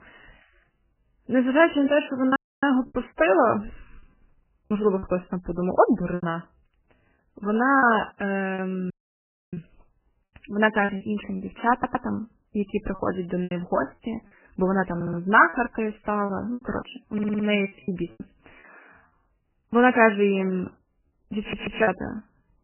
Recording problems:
garbled, watery; badly; nothing above 3 kHz
choppy; very; 8% of the speech affected
audio cutting out; at 2.5 s and at 9 s for 0.5 s
audio stuttering; 4 times, first at 12 s

